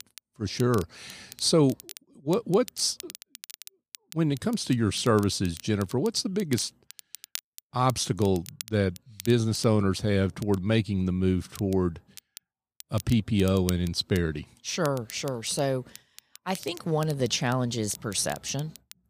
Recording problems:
crackle, like an old record; noticeable; 20 dB below the speech

